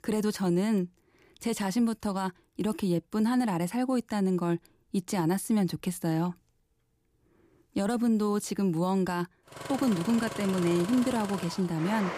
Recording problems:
traffic noise; loud; from 9.5 s on; 10 dB below the speech

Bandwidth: 15 kHz